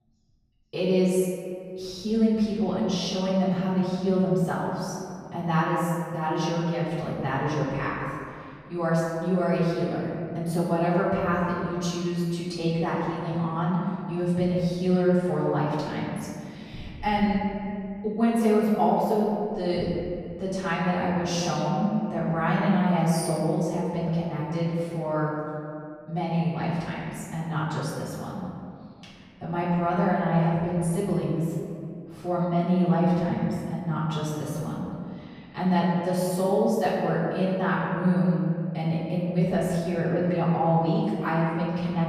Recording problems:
room echo; strong; dies away in 2.2 s
off-mic speech; far

